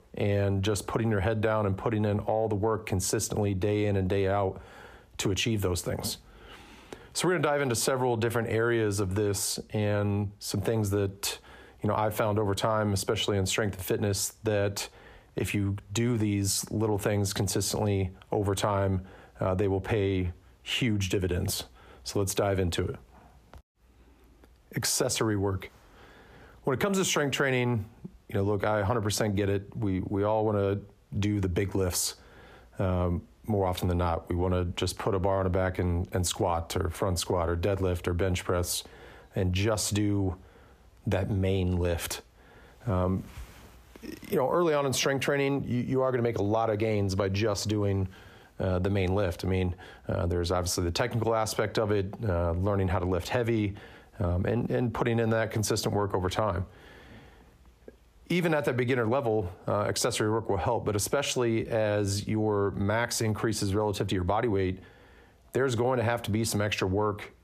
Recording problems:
squashed, flat; heavily

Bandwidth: 15 kHz